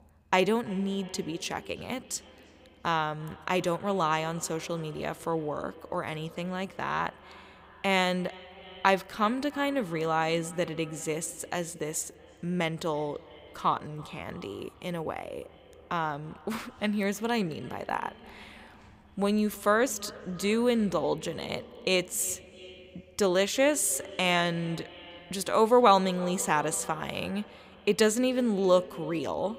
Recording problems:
echo of what is said; faint; throughout; 330 ms later, 20 dB below the speech

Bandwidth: 15.5 kHz